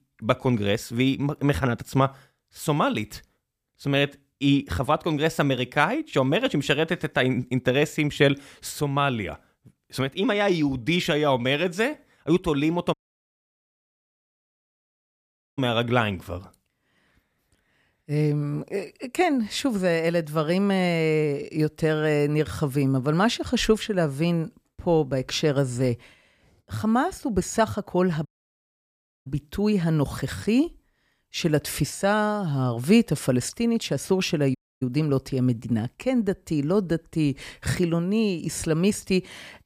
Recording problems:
audio cutting out; at 13 s for 2.5 s, at 28 s for 1 s and at 35 s

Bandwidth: 15 kHz